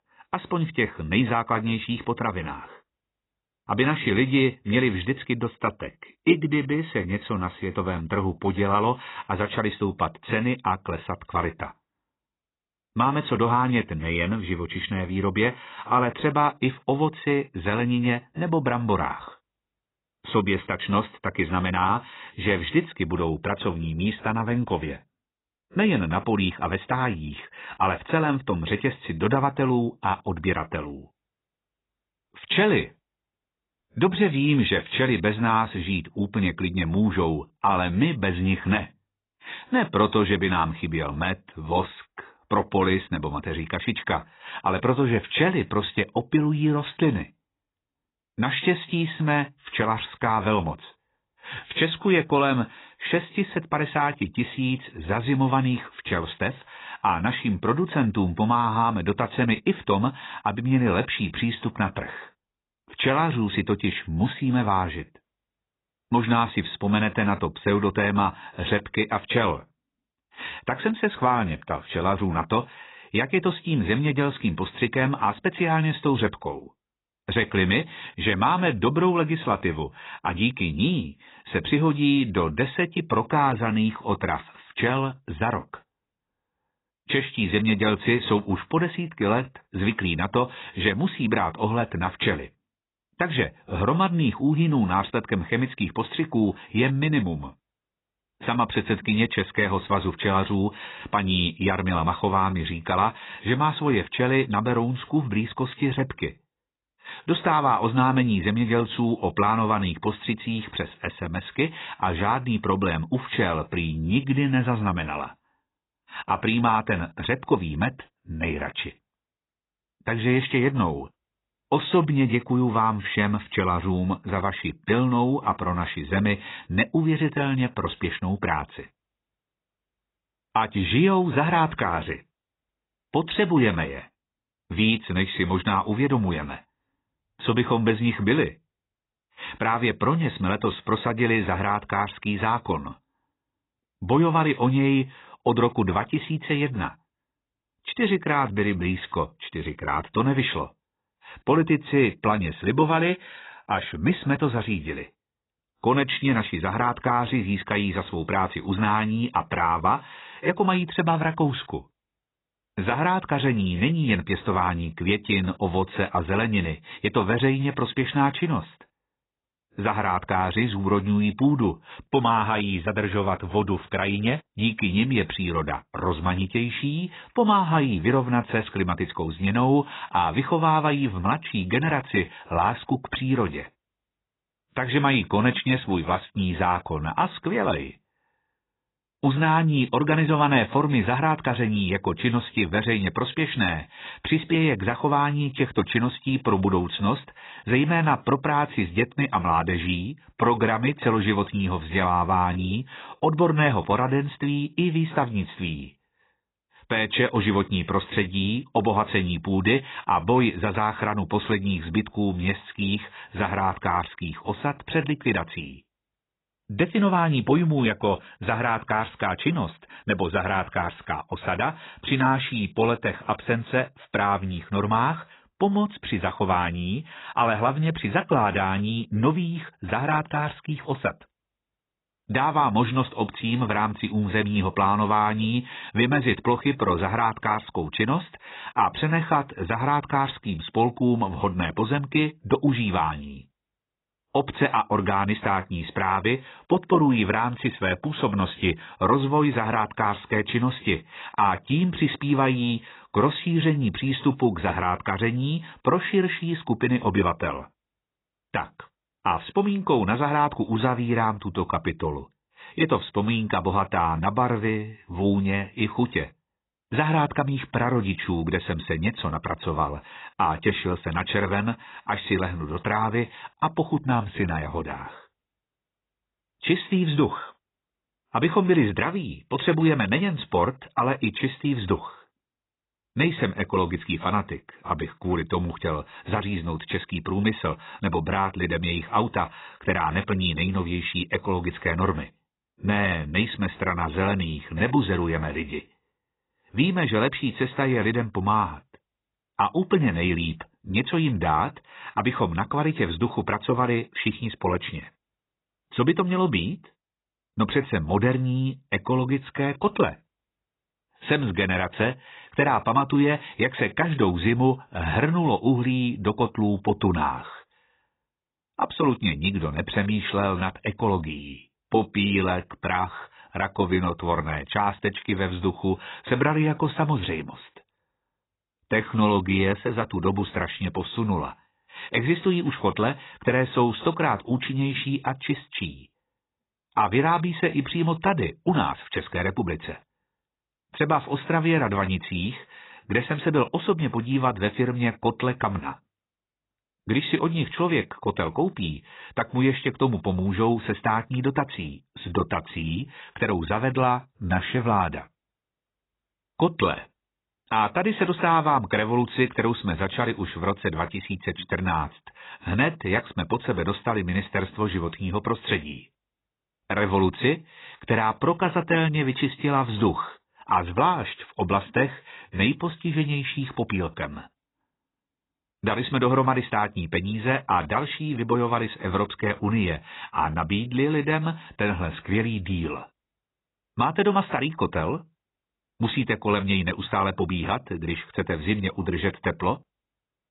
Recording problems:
garbled, watery; badly; nothing above 4 kHz

